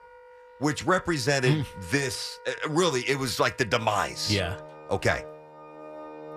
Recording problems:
background music; noticeable; throughout; 20 dB below the speech

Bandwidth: 14.5 kHz